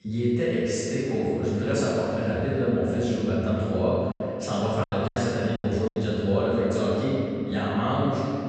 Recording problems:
room echo; strong; dies away in 2.7 s
off-mic speech; far
high frequencies cut off; noticeable; nothing above 8 kHz
choppy; very; from 5 to 6 s; 20% of the speech affected

